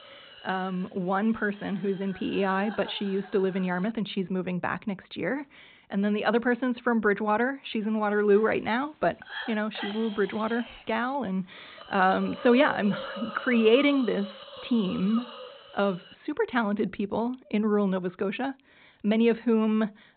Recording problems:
high frequencies cut off; severe; nothing above 4 kHz
hiss; noticeable; until 4 s and from 8 to 16 s; 15 dB below the speech

